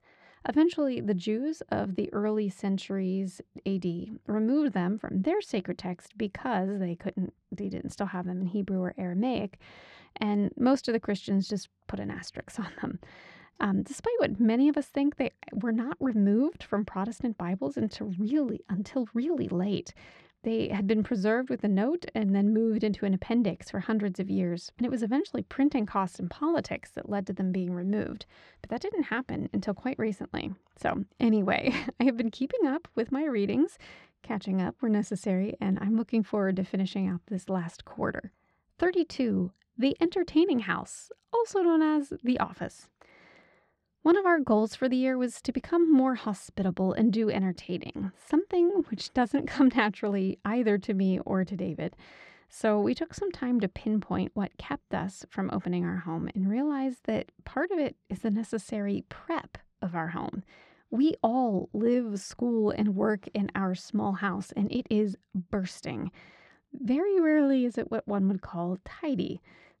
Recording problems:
muffled; slightly; fading above 3.5 kHz

